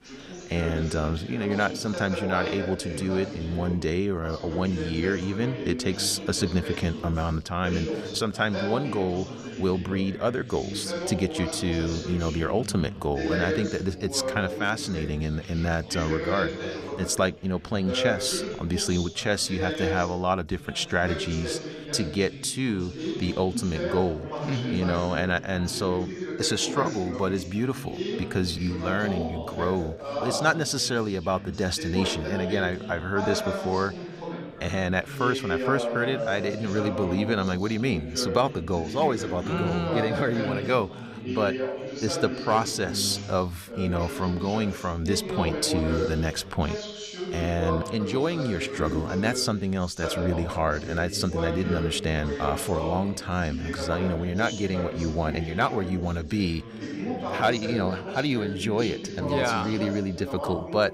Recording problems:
background chatter; loud; throughout; 2 voices, 6 dB below the speech

